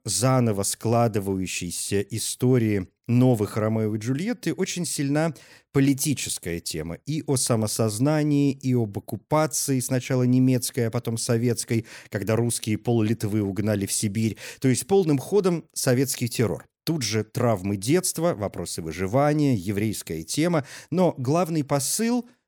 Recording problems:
none

